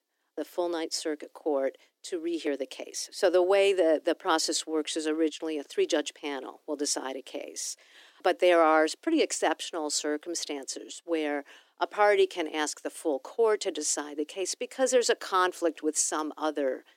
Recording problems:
thin; somewhat; fading below 300 Hz

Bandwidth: 17.5 kHz